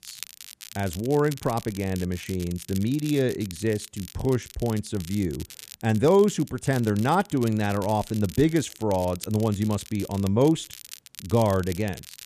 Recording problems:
crackle, like an old record; noticeable; 15 dB below the speech

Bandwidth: 14.5 kHz